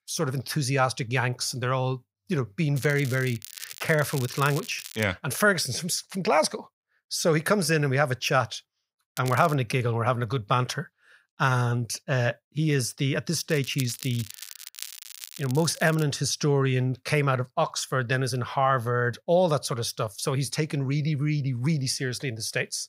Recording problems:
crackling; noticeable; from 3 to 5 s, at 9 s and from 14 to 16 s; 15 dB below the speech

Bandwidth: 15.5 kHz